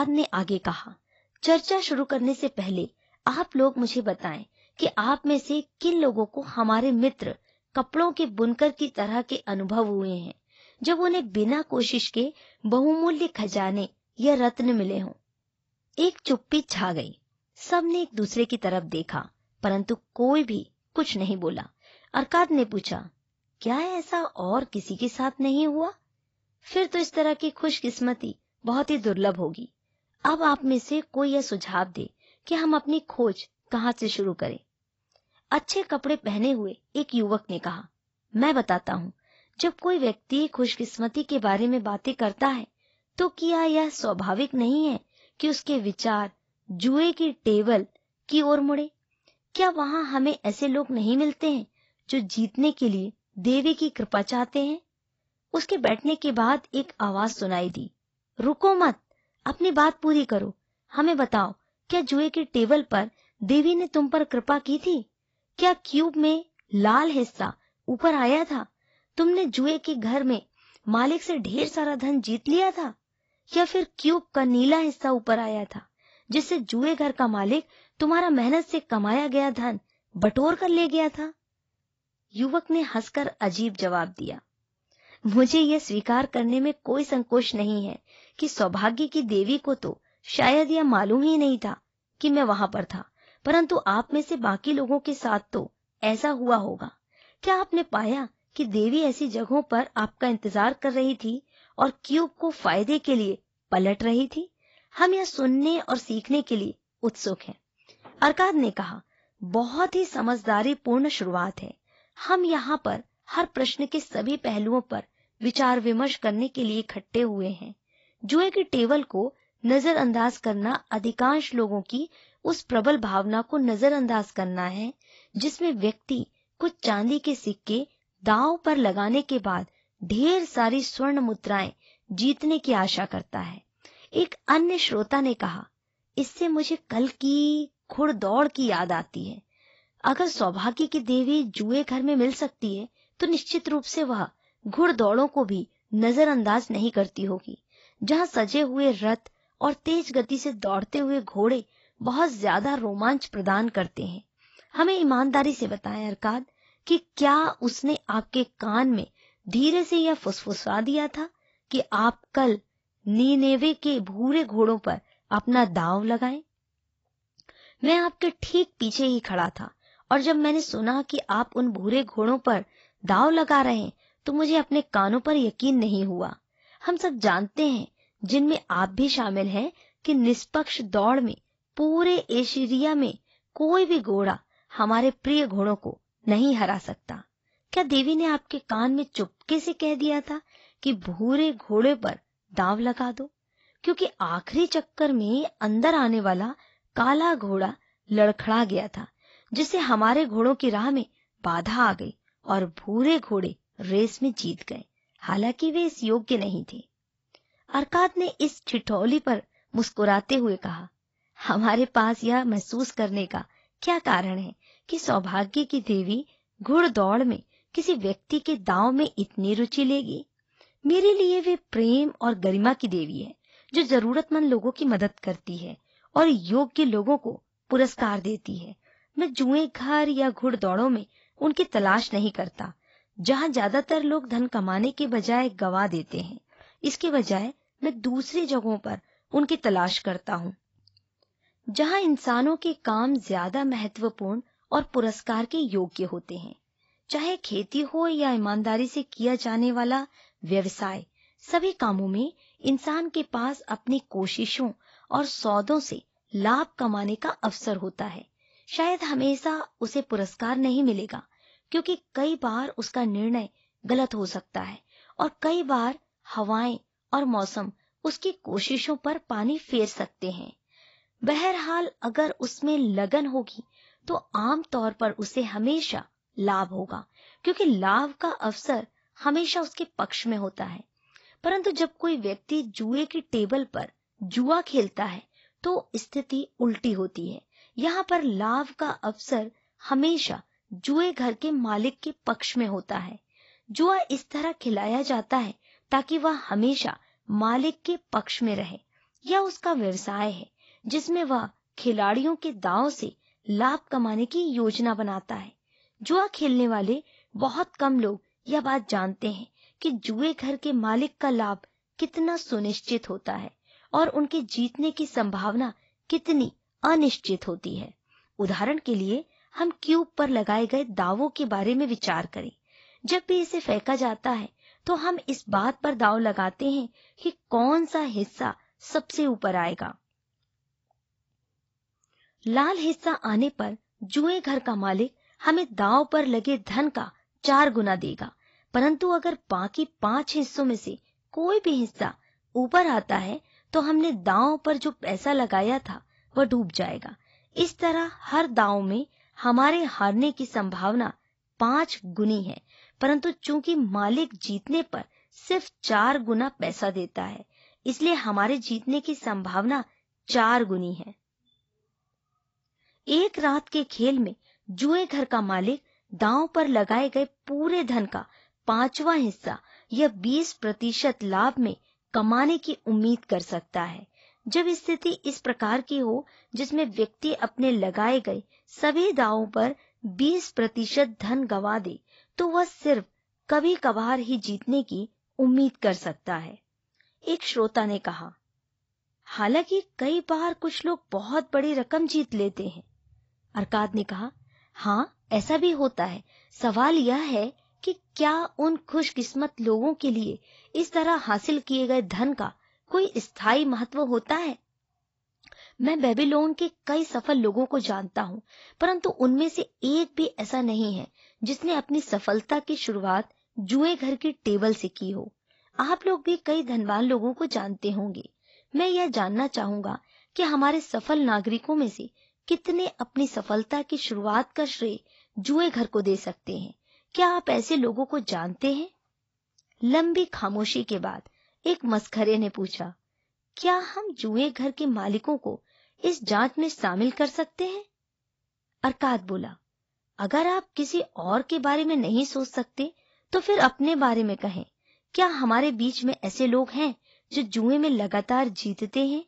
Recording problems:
garbled, watery; badly; nothing above 7.5 kHz
abrupt cut into speech; at the start

